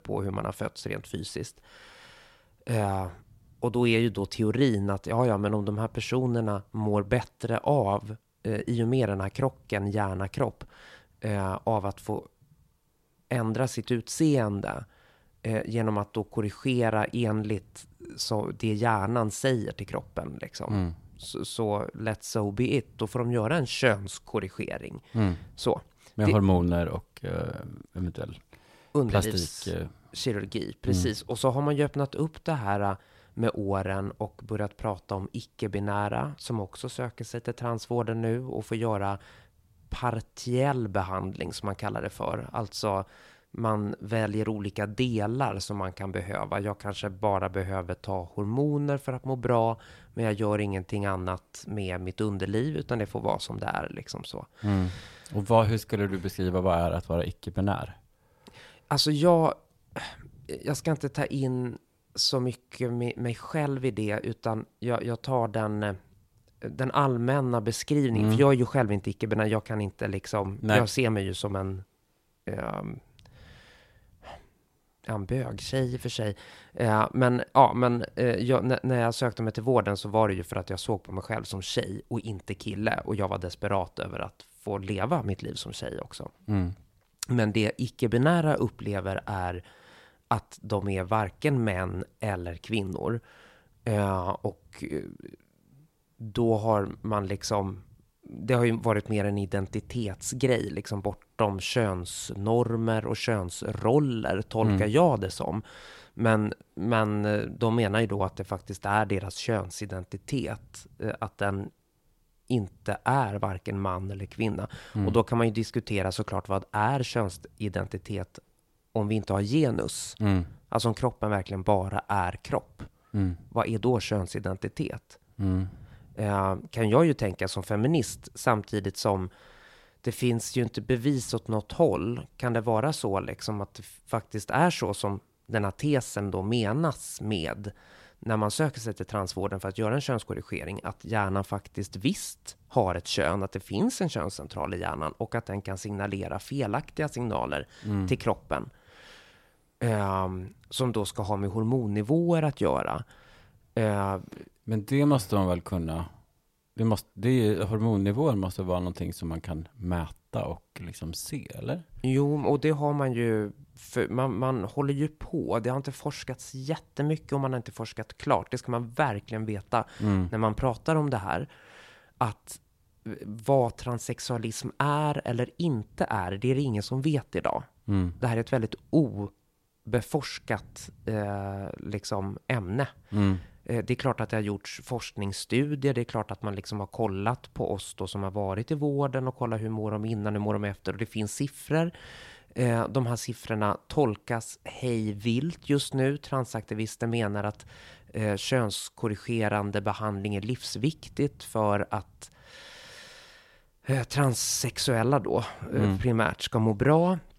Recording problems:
none

